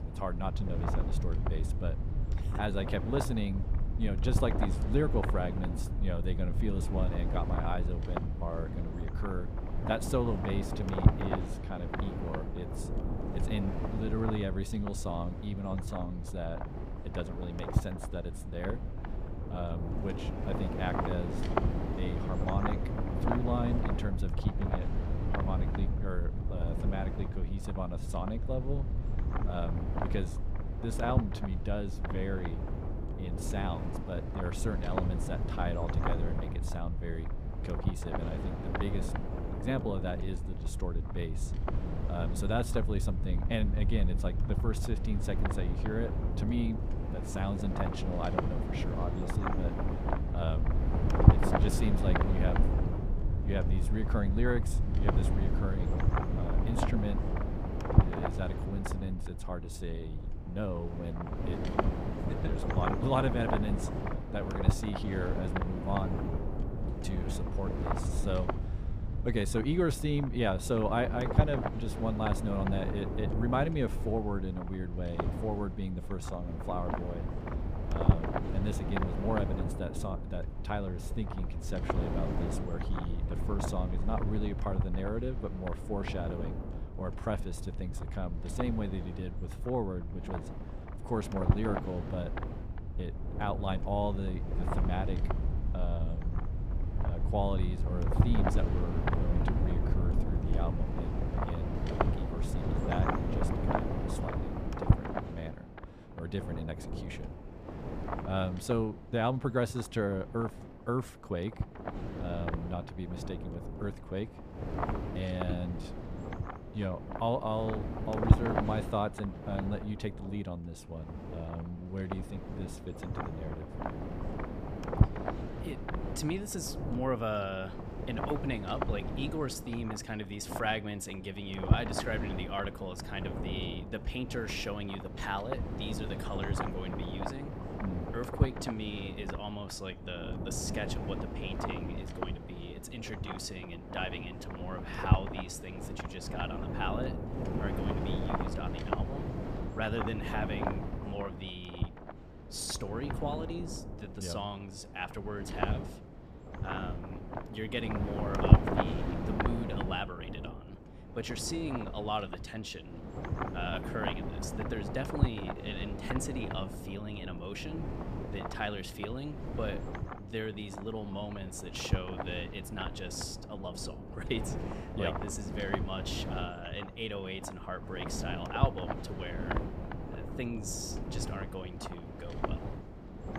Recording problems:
wind noise on the microphone; heavy; 2 dB below the speech
low rumble; noticeable; until 1:45; 15 dB below the speech

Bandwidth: 14.5 kHz